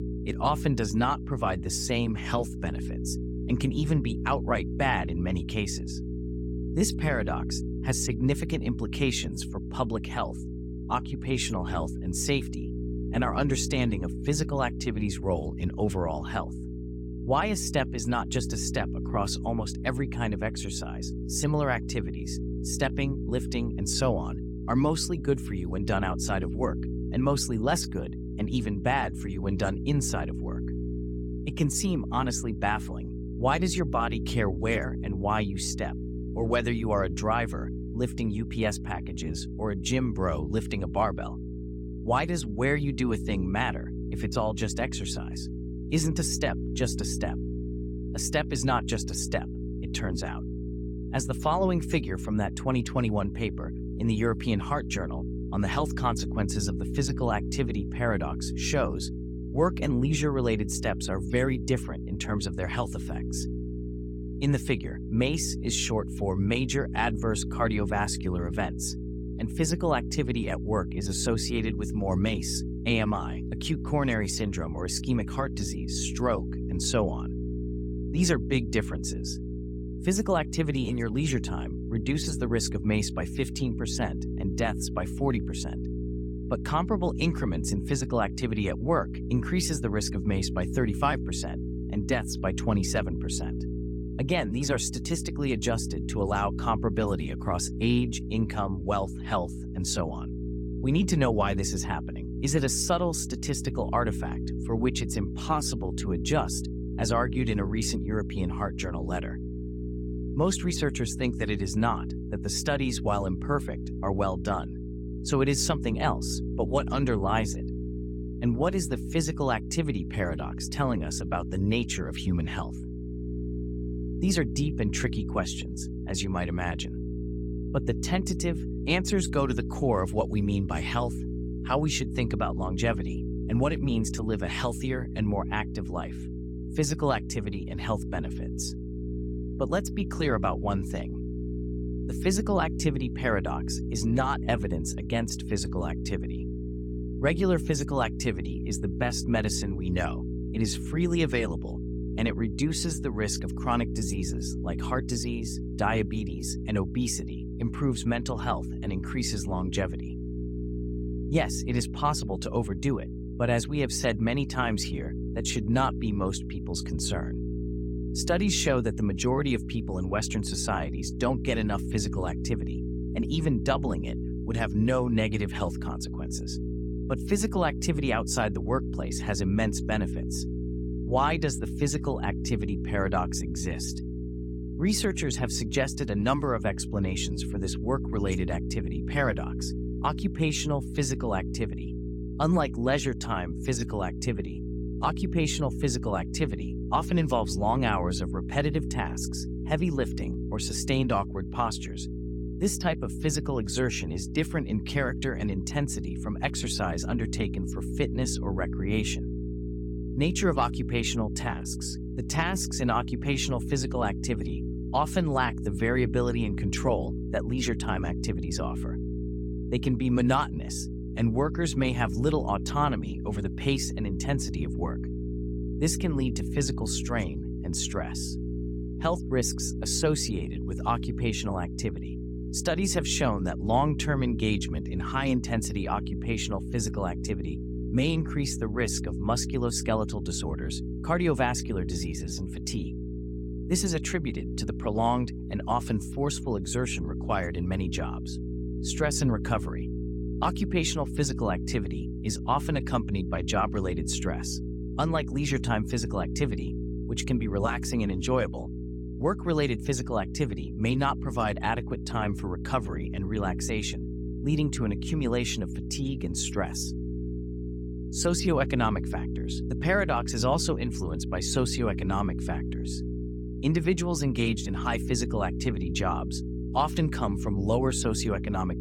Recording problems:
electrical hum; noticeable; throughout; 60 Hz, 10 dB below the speech

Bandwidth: 17 kHz